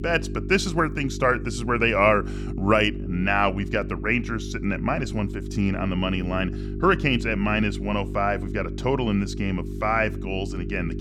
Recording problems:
electrical hum; noticeable; throughout; 50 Hz, 15 dB below the speech

